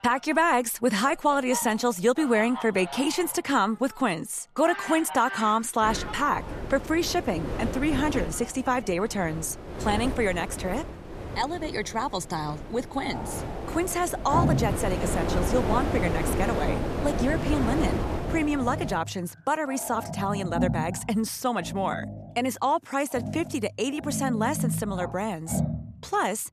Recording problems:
wind noise on the microphone; heavy; from 6 to 19 s; 8 dB below the speech
animal sounds; loud; throughout; 8 dB below the speech

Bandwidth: 14 kHz